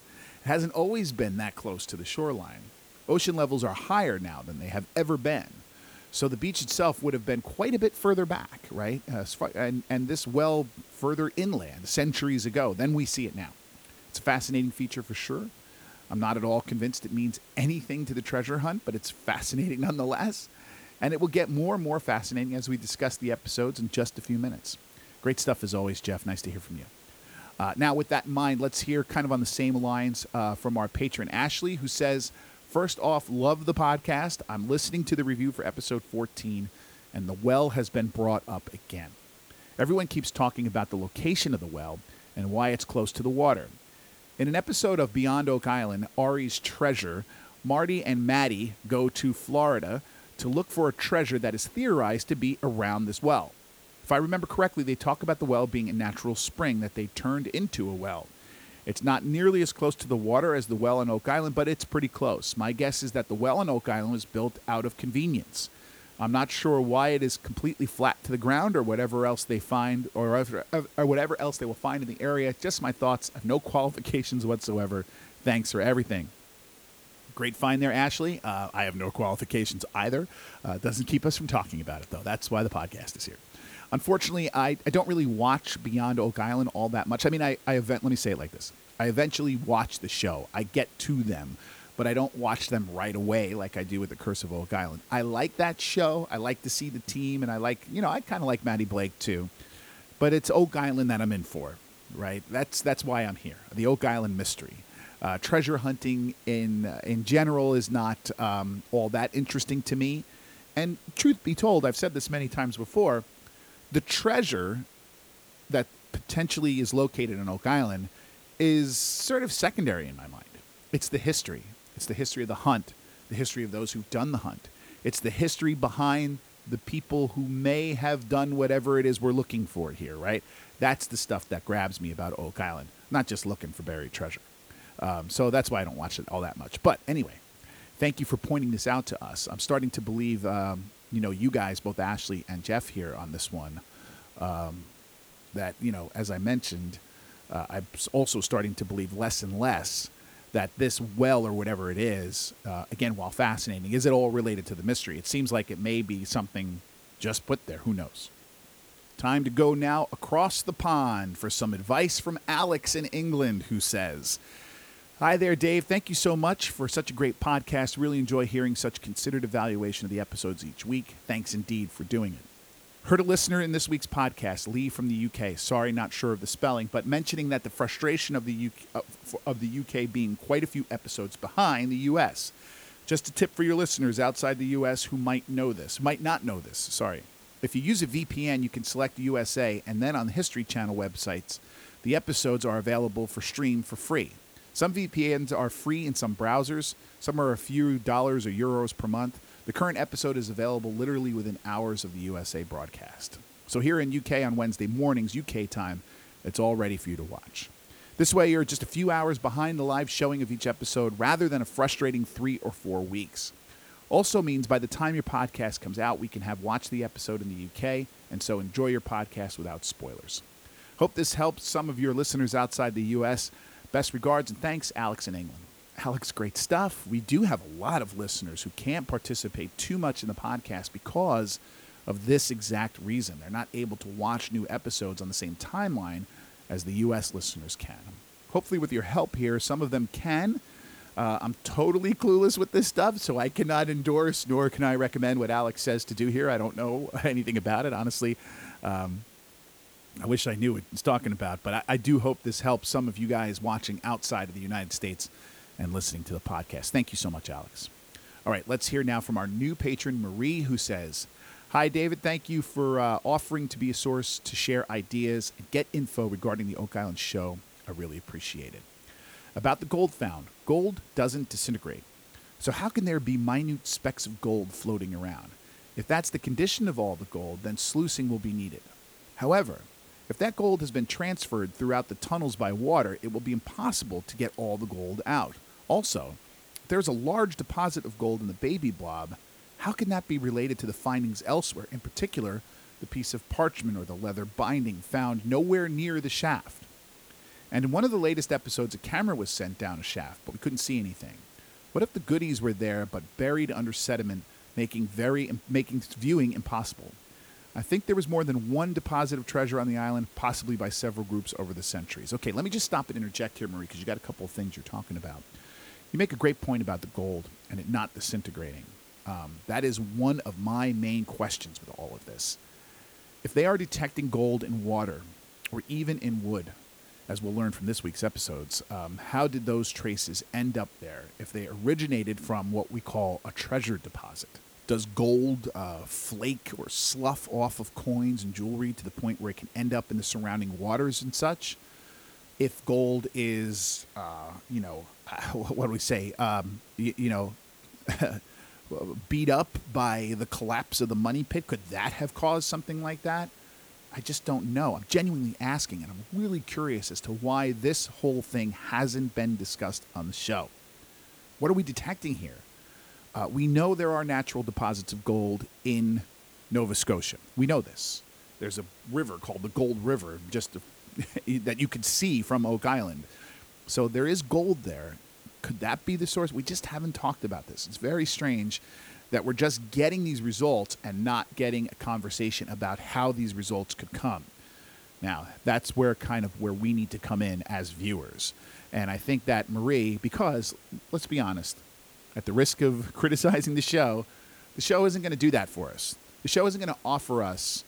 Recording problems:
hiss; faint; throughout; 25 dB below the speech

